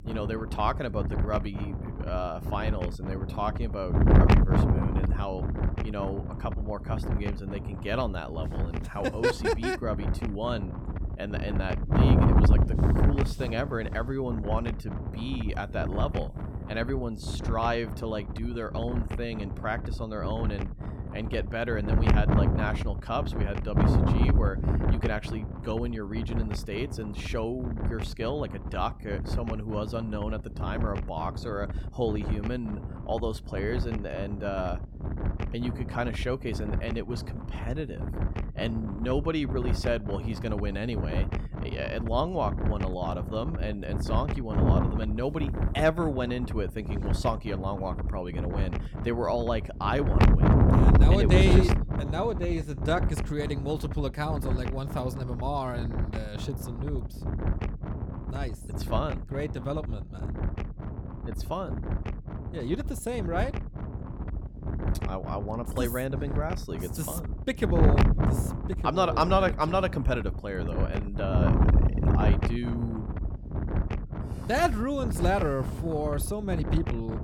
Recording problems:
wind noise on the microphone; heavy; 5 dB below the speech

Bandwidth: 18.5 kHz